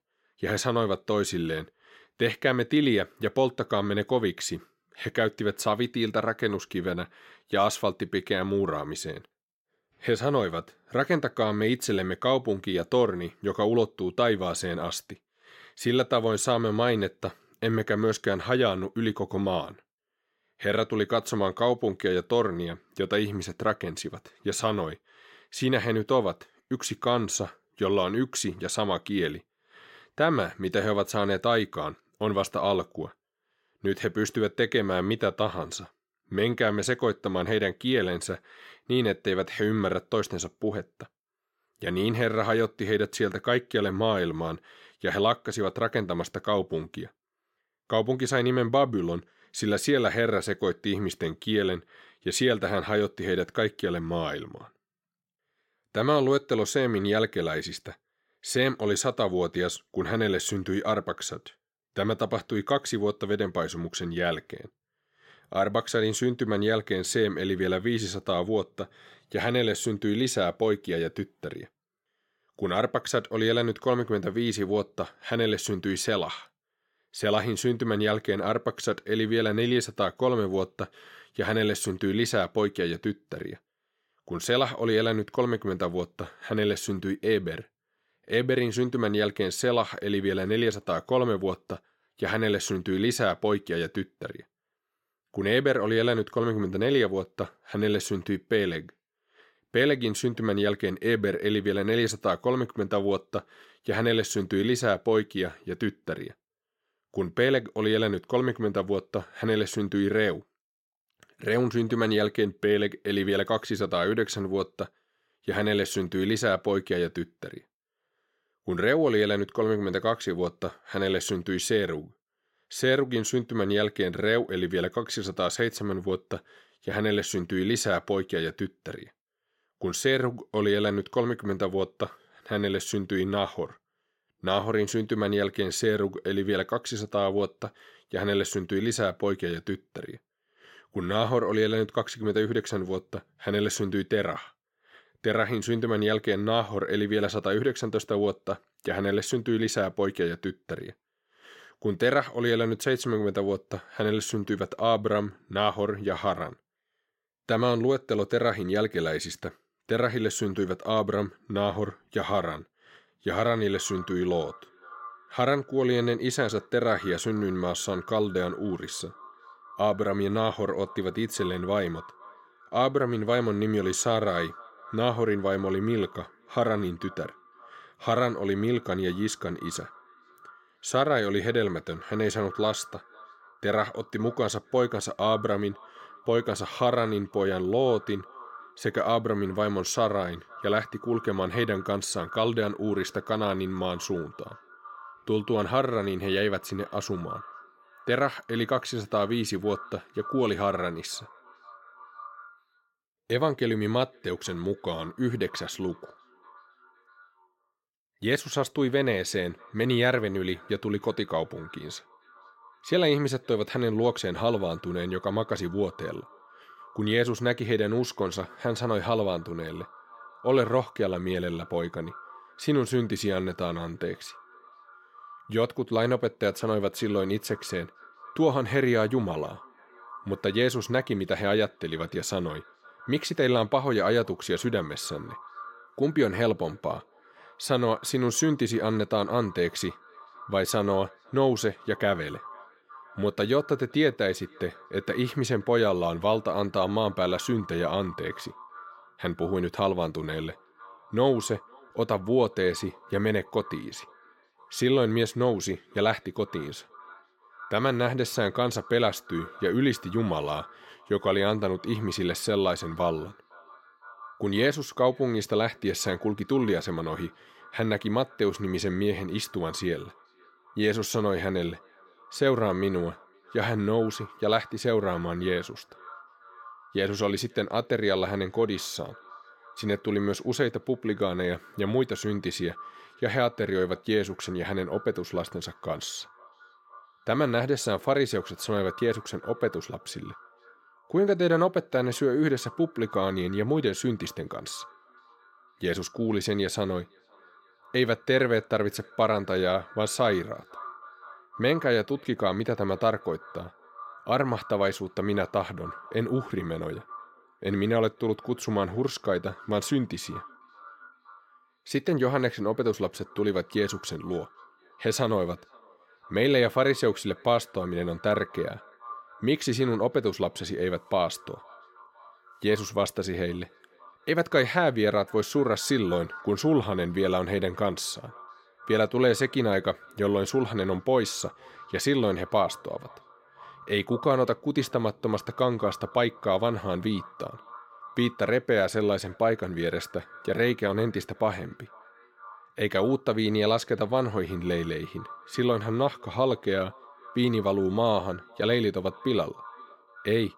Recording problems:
echo of what is said; faint; from 2:44 on; 510 ms later, 20 dB below the speech

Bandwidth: 16.5 kHz